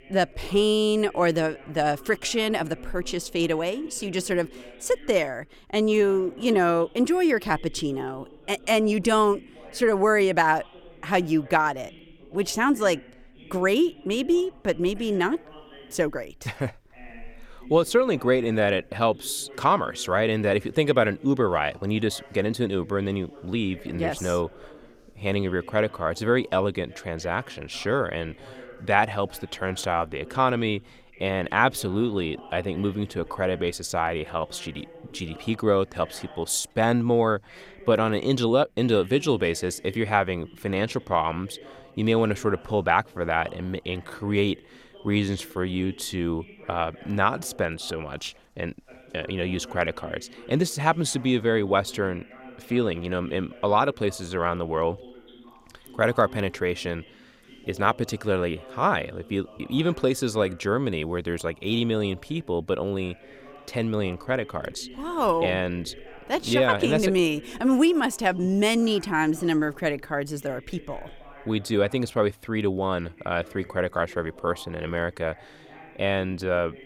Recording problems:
voice in the background; faint; throughout; 20 dB below the speech

